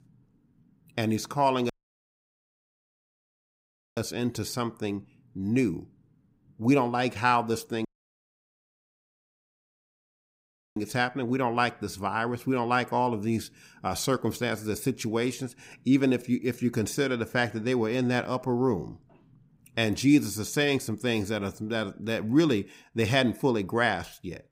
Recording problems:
audio cutting out; at 1.5 s for 2.5 s and at 8 s for 3 s

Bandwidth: 15.5 kHz